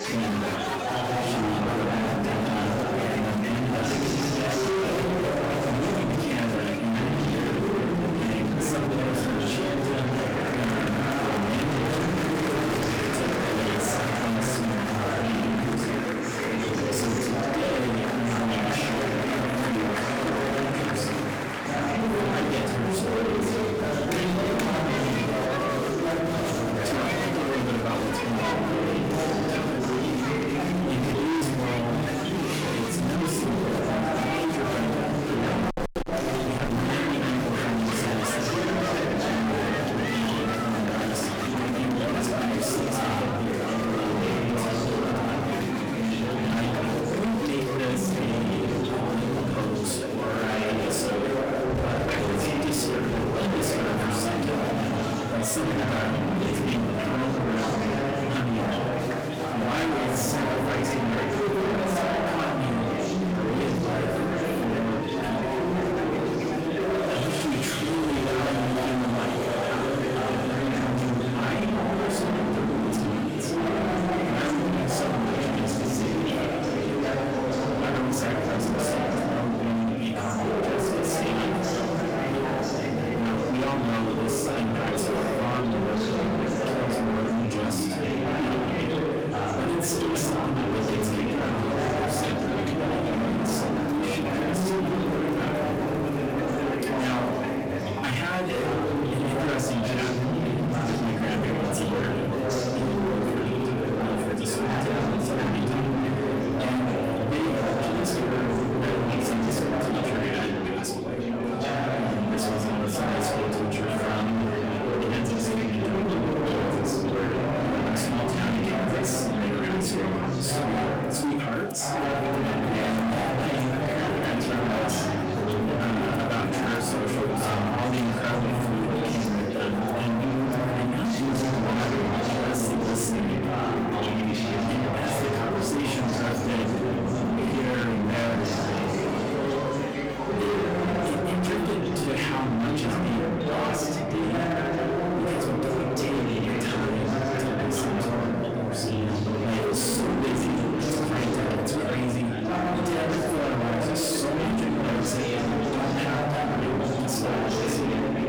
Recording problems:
distortion; heavy; 44% of the sound clipped
off-mic speech; far
room echo; slight; dies away in 0.3 s
chatter from many people; very loud; throughout; 2 dB above the speech
background music; faint; throughout; 25 dB below the speech

